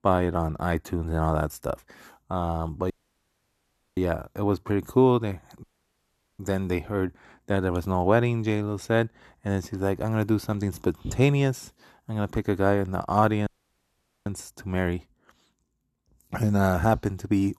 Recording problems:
audio cutting out; at 3 s for 1 s, at 5.5 s for 1 s and at 13 s for 1 s

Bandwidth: 13.5 kHz